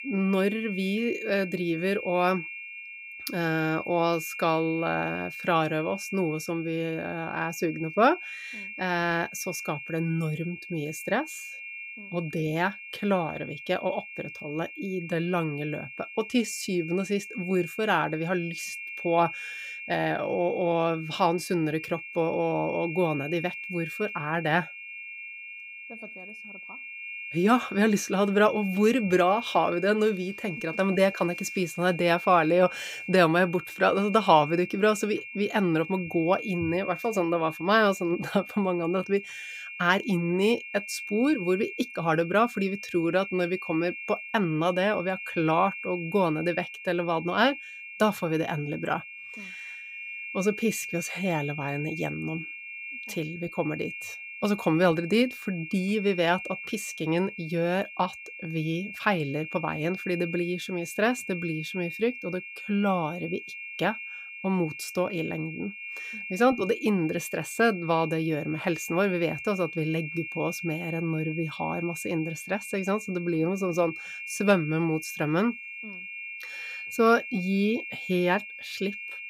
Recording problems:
high-pitched whine; loud; throughout; 2.5 kHz, 10 dB below the speech

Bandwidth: 15.5 kHz